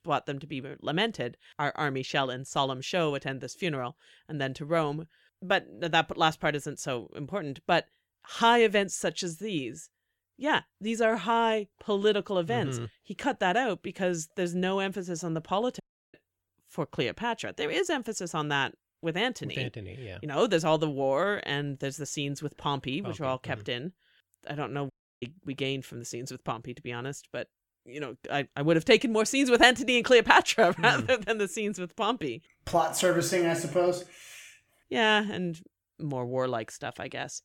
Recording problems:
audio cutting out; at 16 s and at 25 s

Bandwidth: 17 kHz